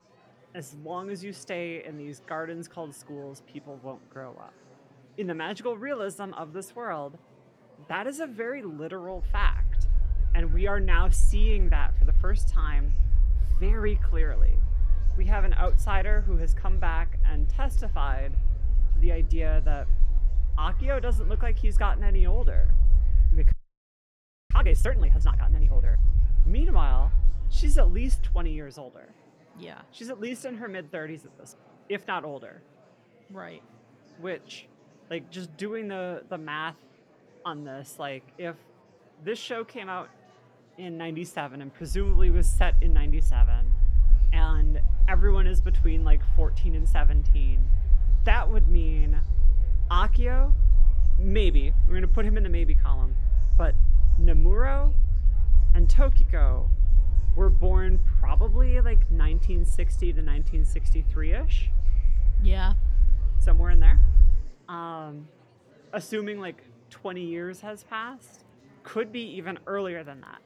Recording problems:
low rumble; noticeable; from 9.5 to 28 s and from 42 s to 1:04; 15 dB below the speech
murmuring crowd; faint; throughout; 20 dB below the speech
audio freezing; at 24 s for 1 s

